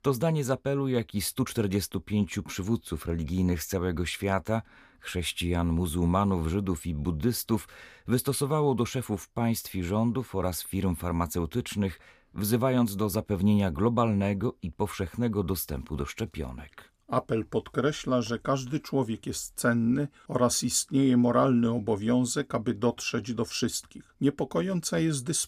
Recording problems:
none

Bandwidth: 15 kHz